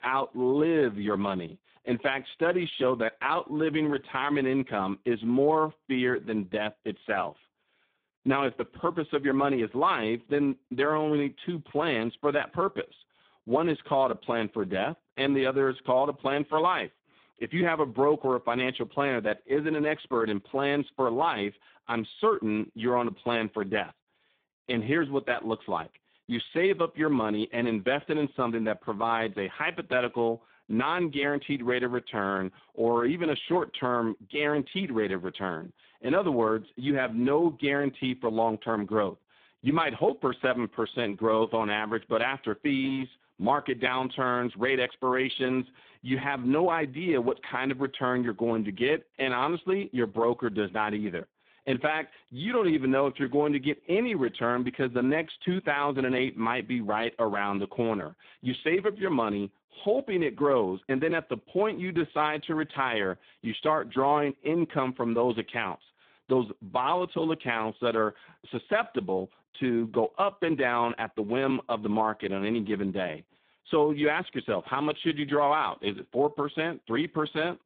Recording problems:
phone-call audio; poor line

